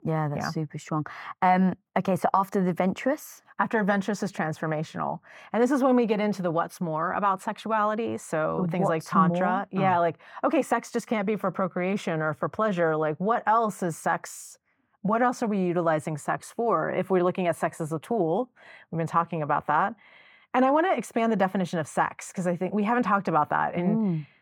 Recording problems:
muffled; slightly; fading above 3.5 kHz

